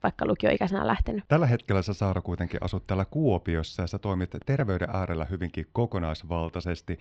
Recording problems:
muffled; slightly; fading above 4 kHz

